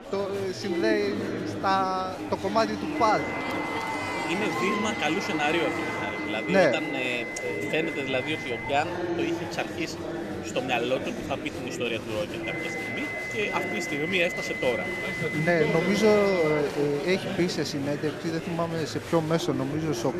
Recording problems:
high-pitched whine; loud; from 3 to 8.5 s and from 12 to 17 s; 2 kHz, 6 dB below the speech
murmuring crowd; loud; throughout; 5 dB below the speech

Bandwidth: 14.5 kHz